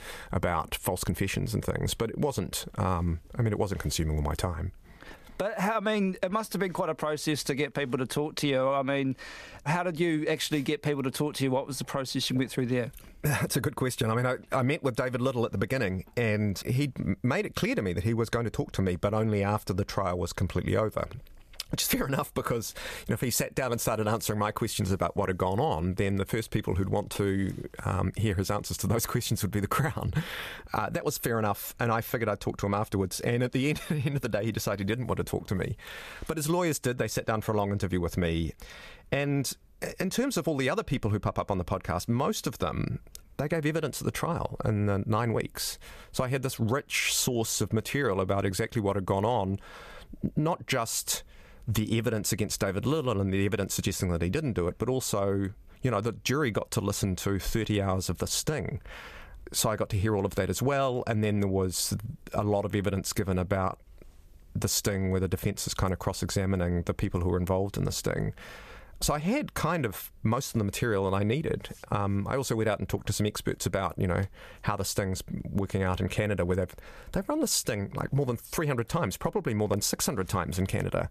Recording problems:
squashed, flat; somewhat

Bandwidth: 14.5 kHz